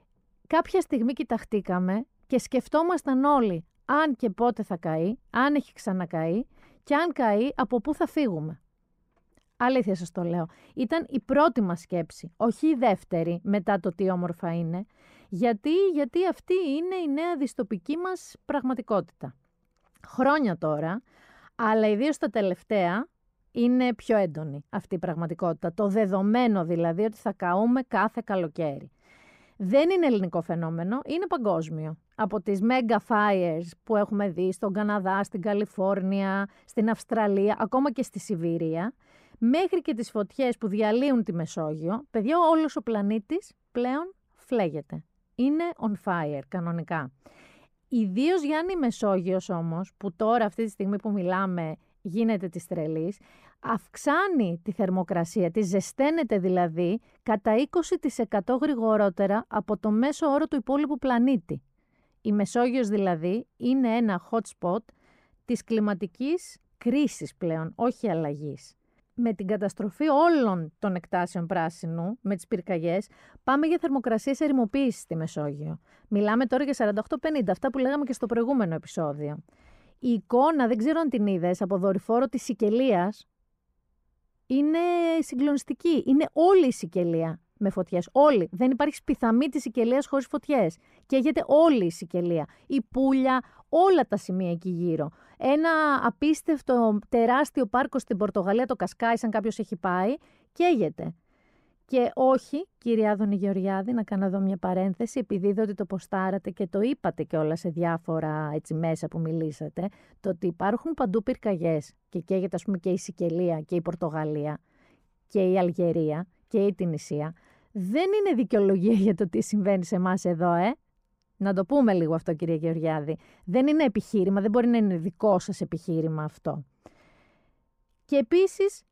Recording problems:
muffled; slightly; fading above 2 kHz

